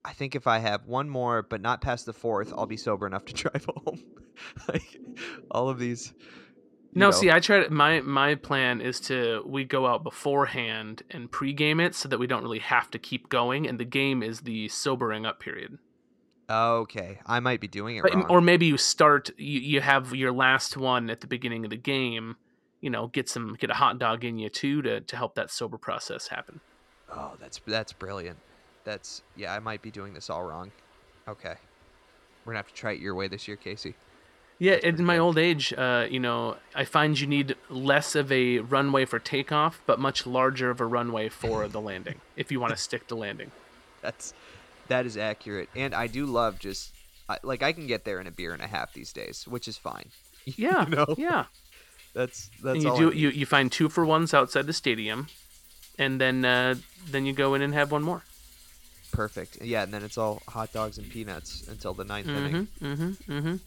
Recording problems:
rain or running water; faint; throughout; 25 dB below the speech

